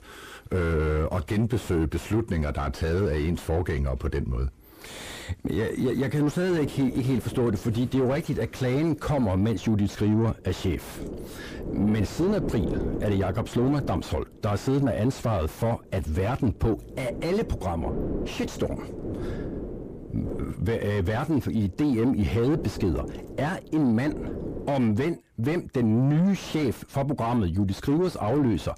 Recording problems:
distortion; heavy; 6 dB below the speech
wind noise on the microphone; heavy; from 6.5 to 25 s; 9 dB below the speech

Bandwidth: 15 kHz